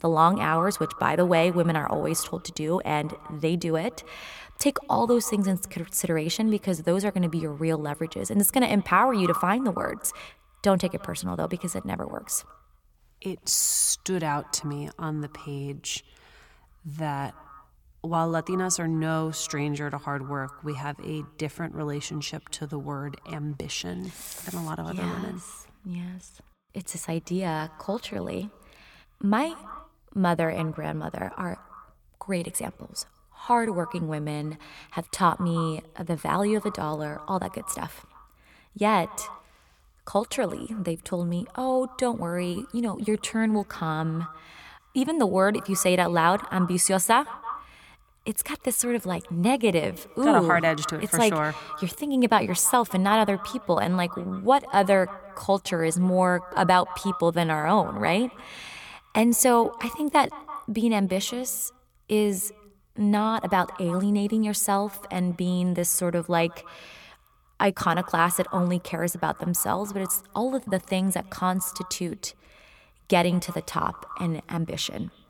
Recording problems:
echo of what is said; noticeable; throughout; 160 ms later, 15 dB below the speech

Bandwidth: 18.5 kHz